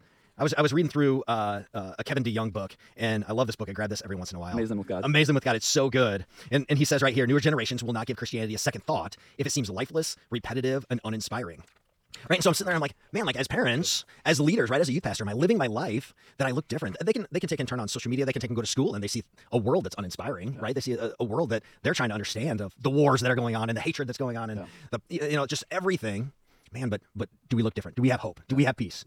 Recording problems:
wrong speed, natural pitch; too fast; 1.7 times normal speed

